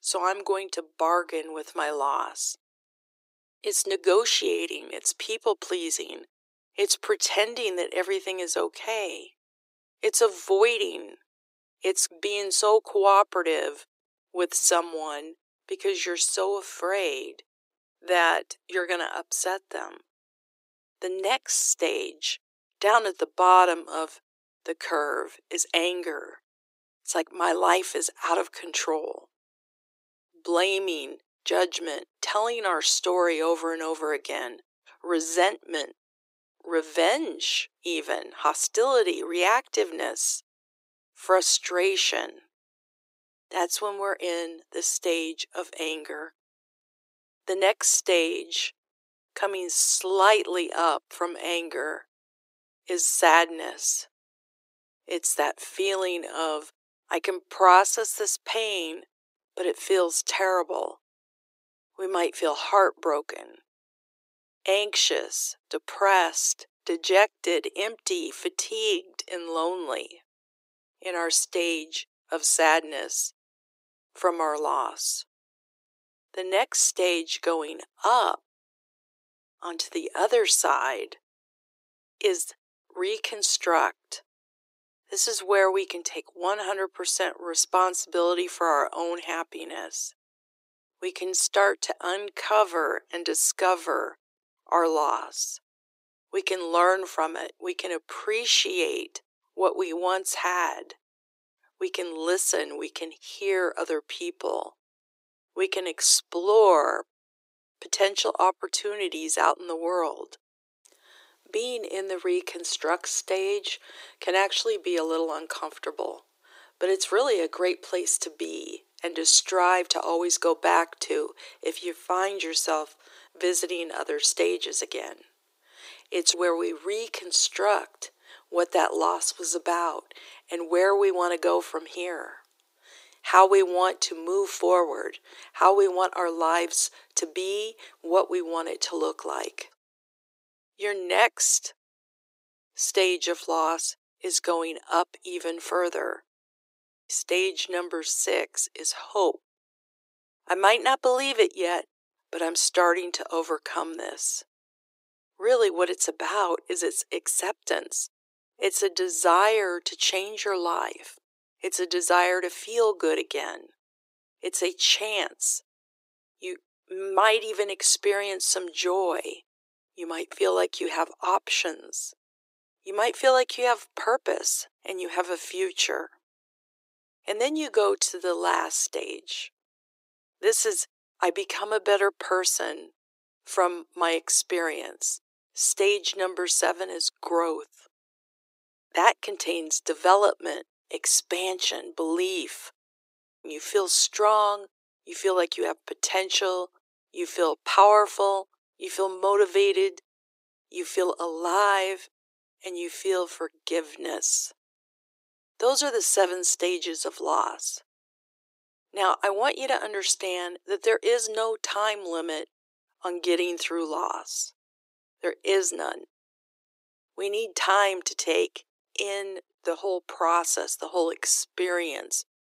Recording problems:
thin; very; fading below 350 Hz

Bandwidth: 15.5 kHz